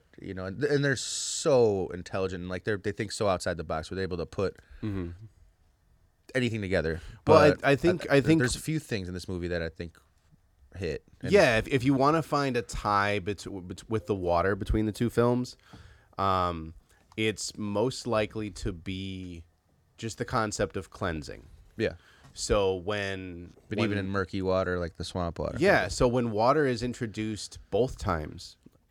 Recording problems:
none

